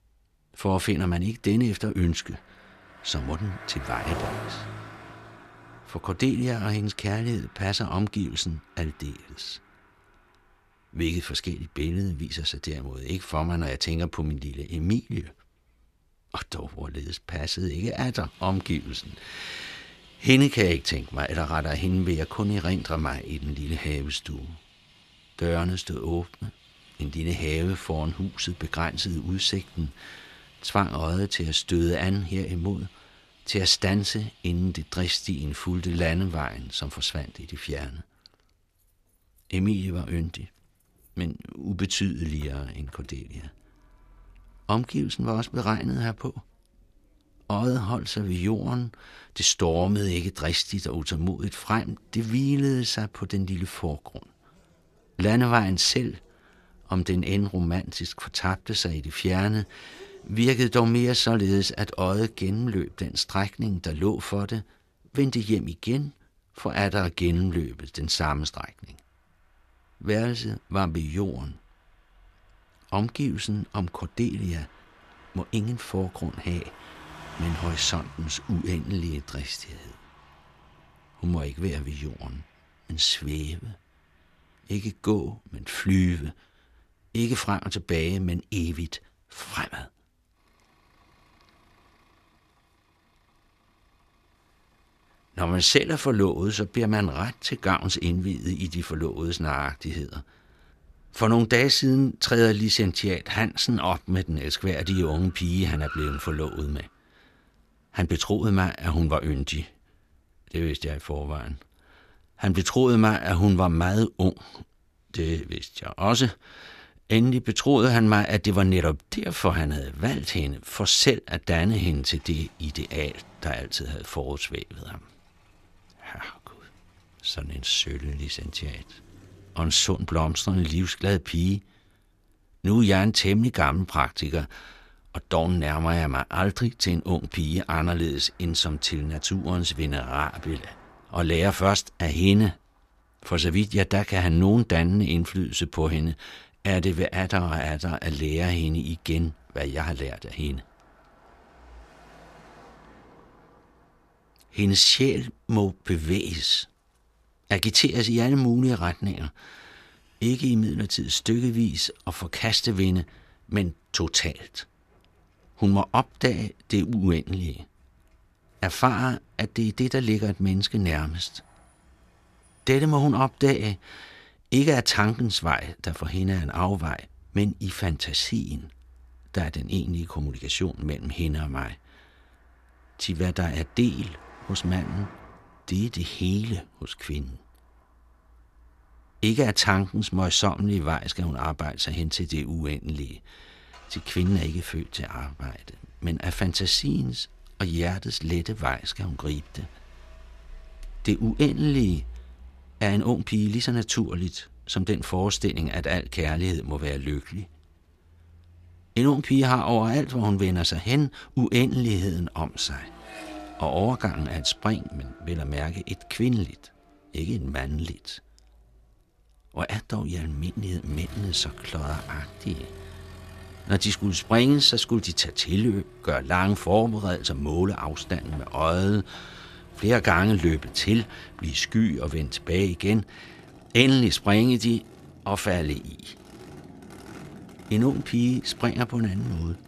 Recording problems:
traffic noise; faint; throughout; 25 dB below the speech

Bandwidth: 14.5 kHz